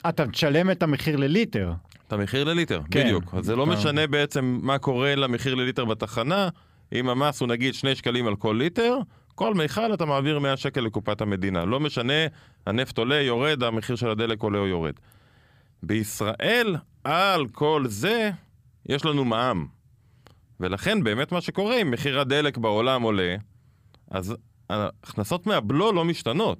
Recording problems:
none

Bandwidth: 15 kHz